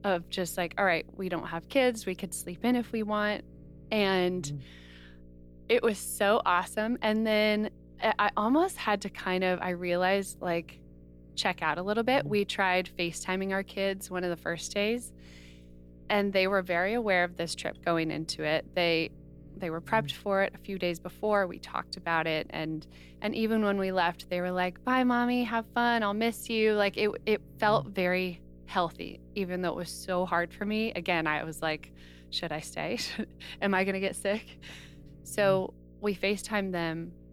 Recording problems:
electrical hum; faint; throughout; 60 Hz, 30 dB below the speech

